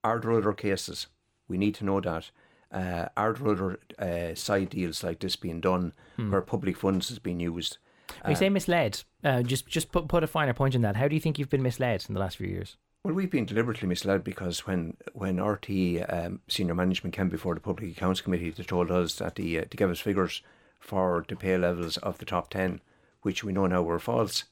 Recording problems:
none

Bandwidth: 17 kHz